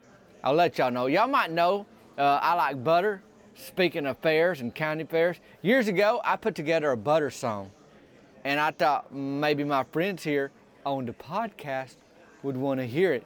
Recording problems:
murmuring crowd; faint; throughout; 30 dB below the speech

